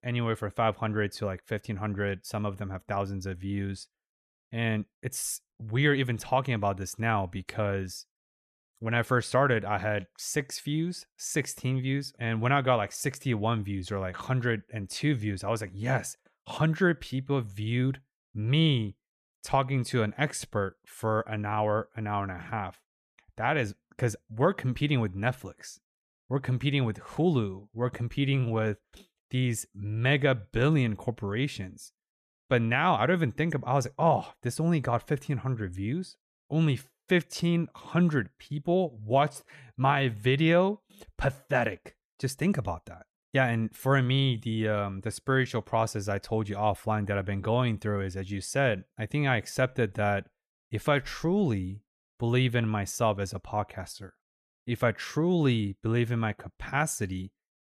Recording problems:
none

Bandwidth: 14 kHz